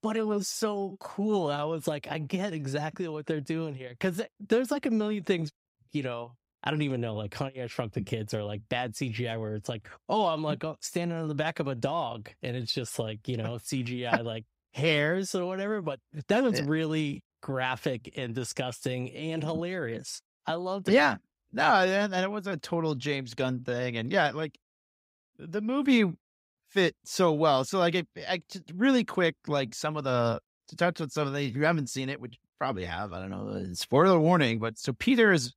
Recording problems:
none

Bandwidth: 15.5 kHz